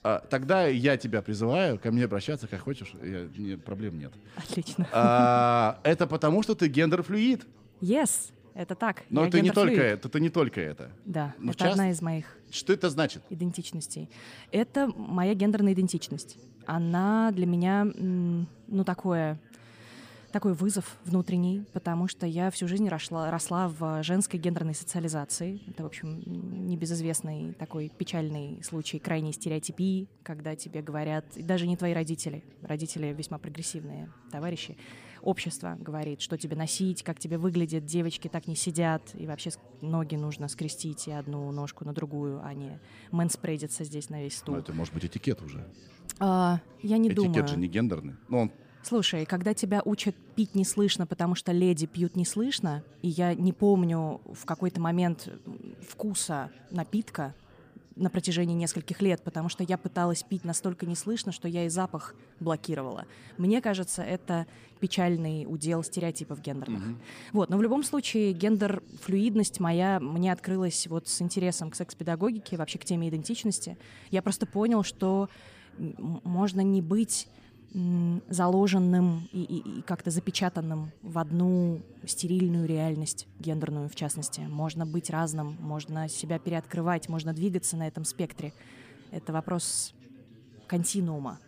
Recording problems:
background chatter; faint; throughout; 4 voices, 25 dB below the speech

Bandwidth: 15 kHz